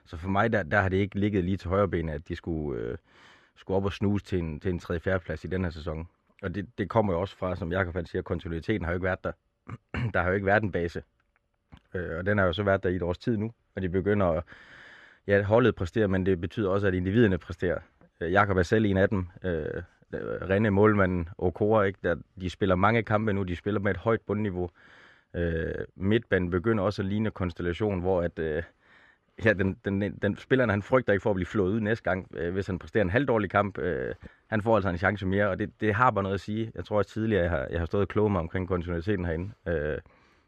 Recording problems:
muffled; slightly; fading above 3 kHz

